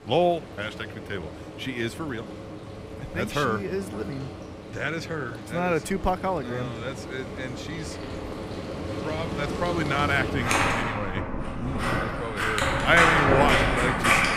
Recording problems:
household noises; very loud; throughout; 2 dB above the speech

